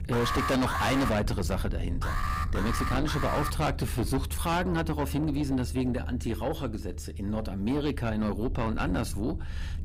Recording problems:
distortion; heavy; 7 dB below the speech
low rumble; noticeable; throughout; 15 dB below the speech
alarm; loud; at the start; peak level with the speech
alarm; noticeable; from 2 to 3.5 s; peak 3 dB below the speech

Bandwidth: 15.5 kHz